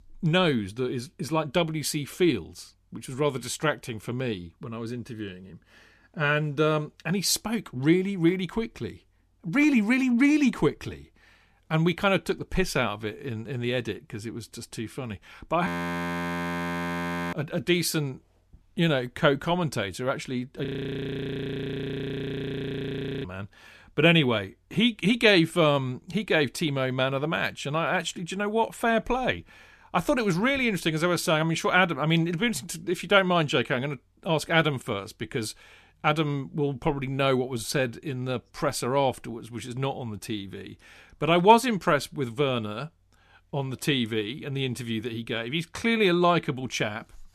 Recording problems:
audio freezing; at 16 s for 1.5 s and at 21 s for 2.5 s

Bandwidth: 14.5 kHz